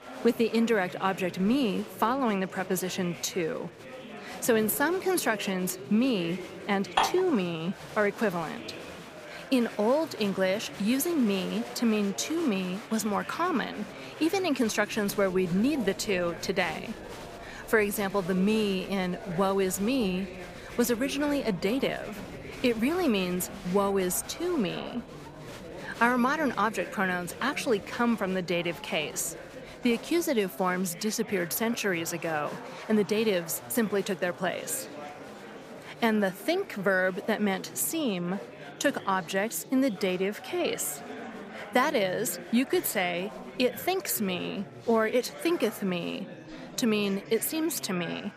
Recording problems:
murmuring crowd; noticeable; throughout; 15 dB below the speech
clattering dishes; loud; at 7 s; peak 1 dB above the speech

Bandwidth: 15 kHz